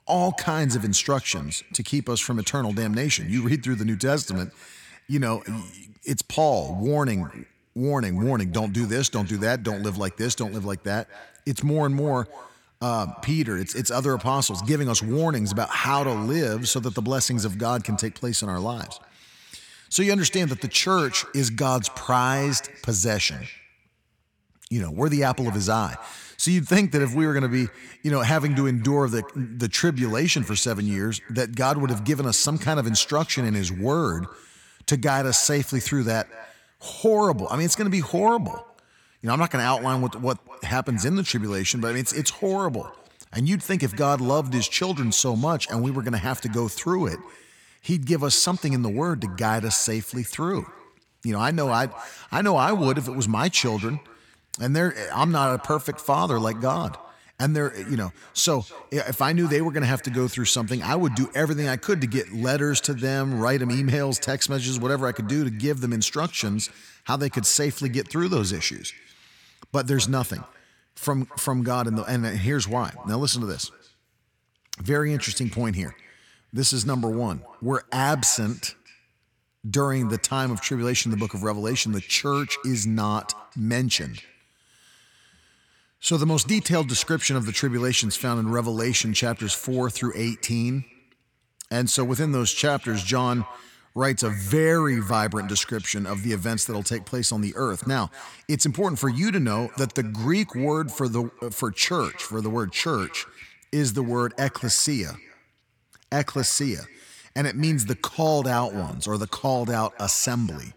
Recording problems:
echo of what is said; faint; throughout; 230 ms later, 20 dB below the speech

